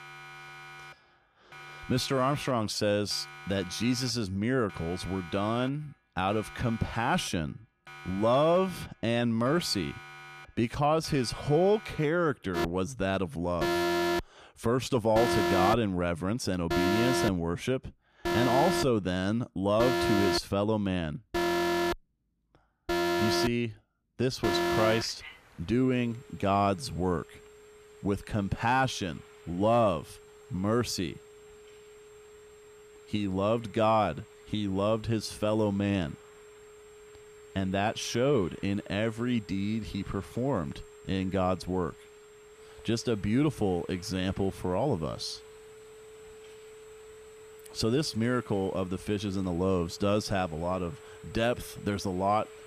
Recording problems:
alarms or sirens; loud; throughout; 3 dB below the speech

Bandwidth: 15 kHz